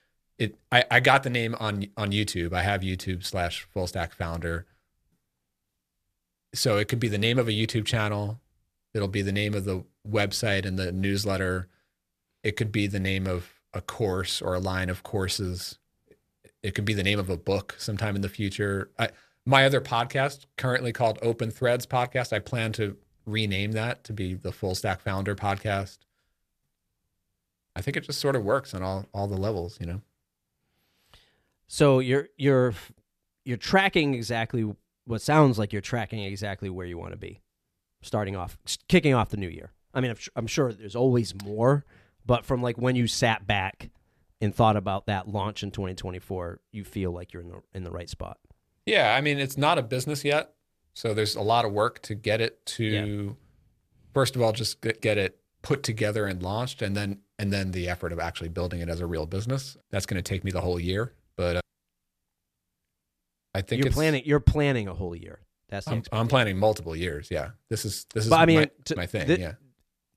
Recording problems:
none

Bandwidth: 14.5 kHz